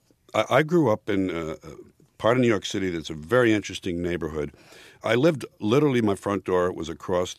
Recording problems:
none

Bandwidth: 14.5 kHz